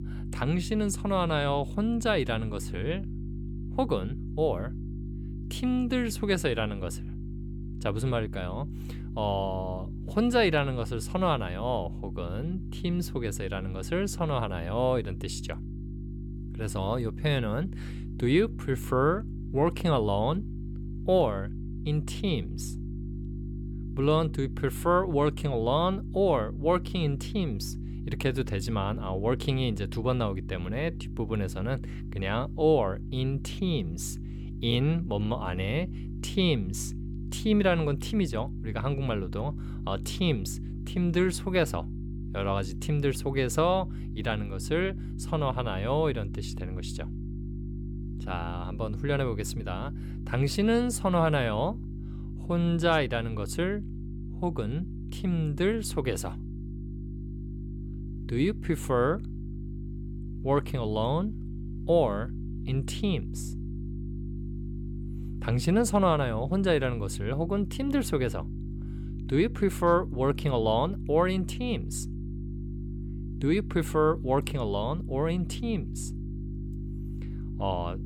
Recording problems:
electrical hum; noticeable; throughout; 50 Hz, 15 dB below the speech

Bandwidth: 17 kHz